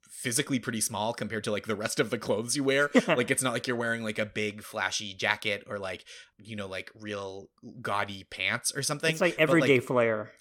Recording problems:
none

